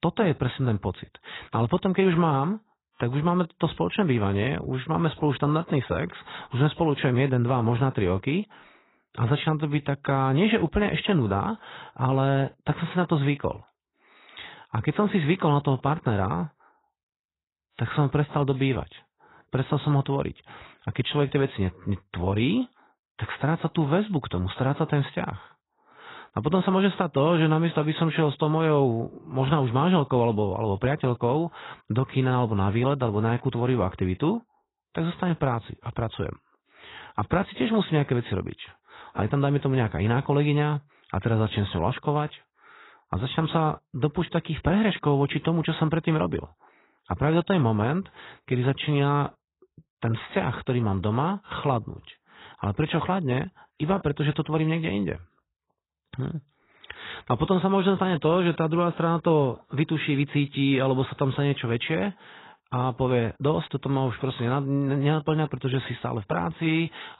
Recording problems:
garbled, watery; badly; nothing above 4 kHz

